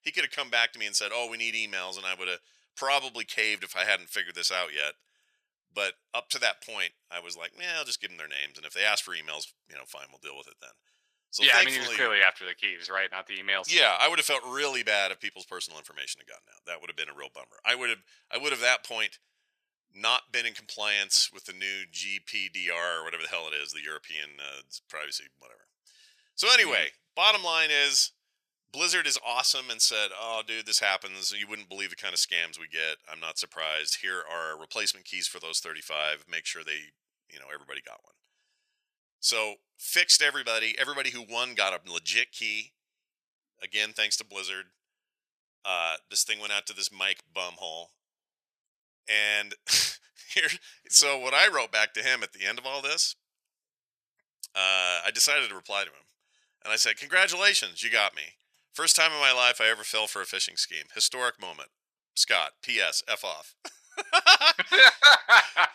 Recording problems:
thin; very; fading below 850 Hz

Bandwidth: 14.5 kHz